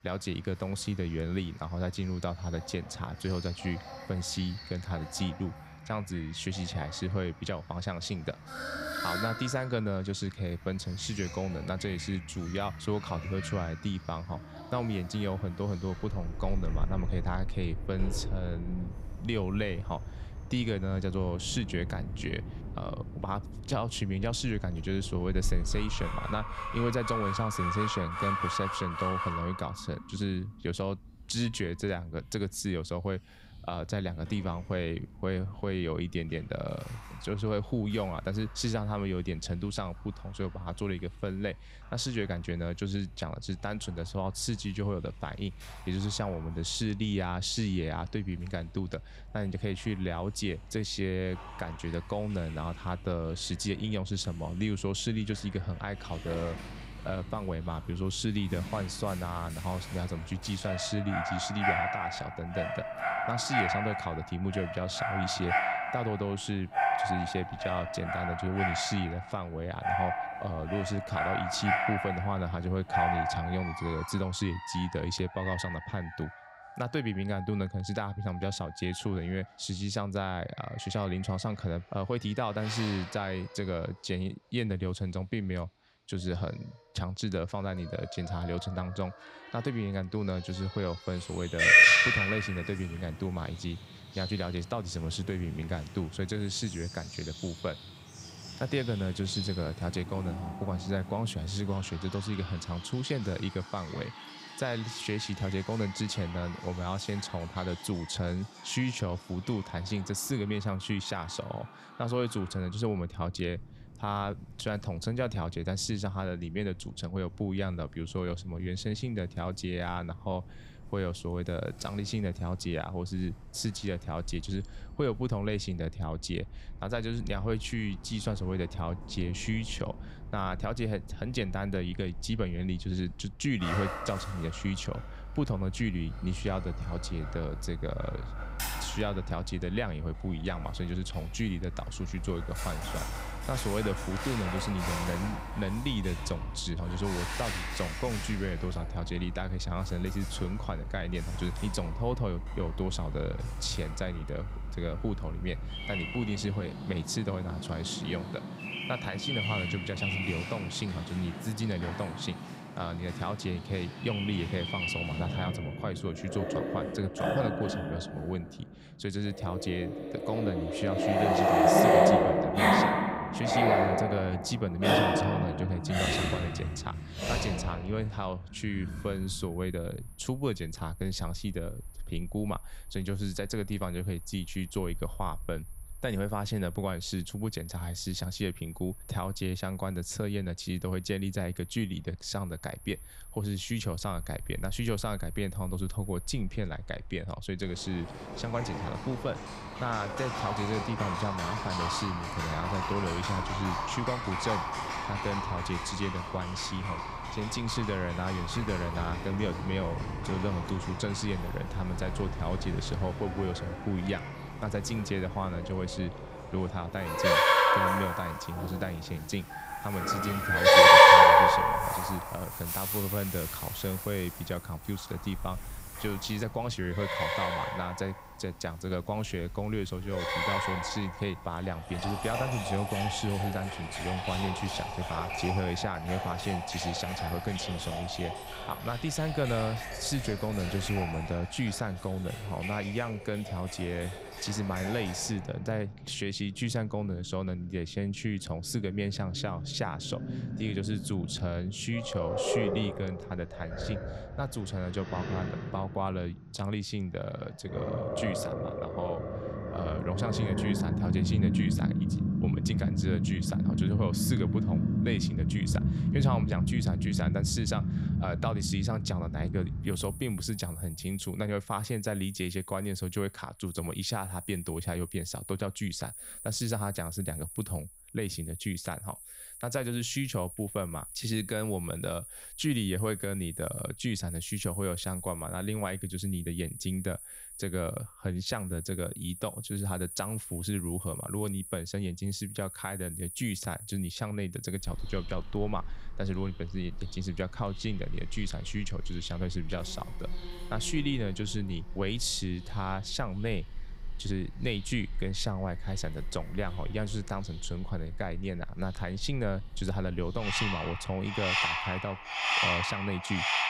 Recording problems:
animal sounds; very loud; throughout; 3 dB above the speech

